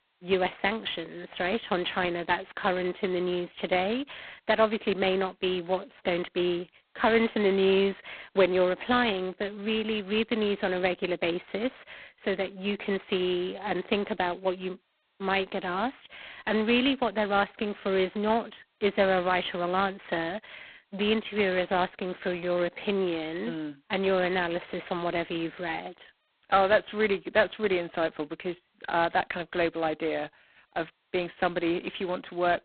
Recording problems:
phone-call audio; poor line; nothing above 4 kHz

